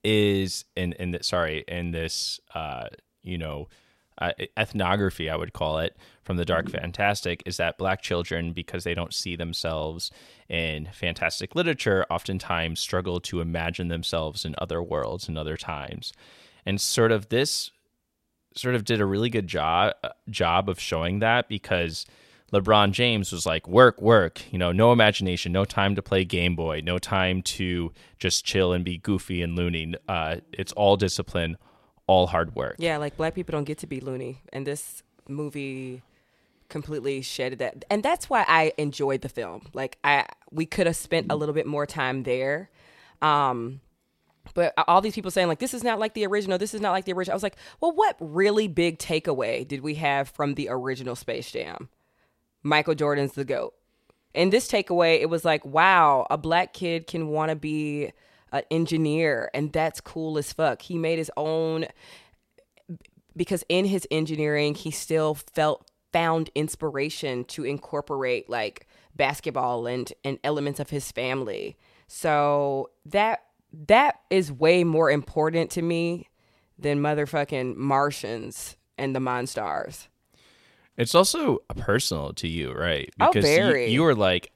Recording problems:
none

